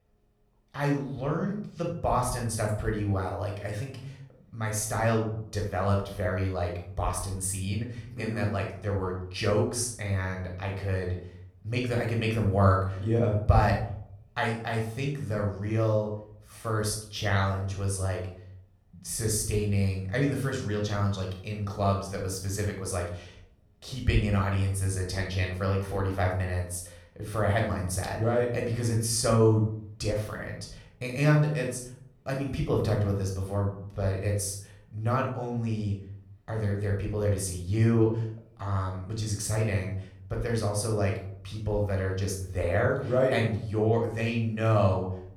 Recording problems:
room echo; noticeable; dies away in 0.5 s
off-mic speech; somewhat distant

